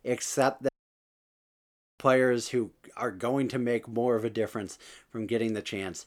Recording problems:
audio cutting out; at 0.5 s for 1.5 s

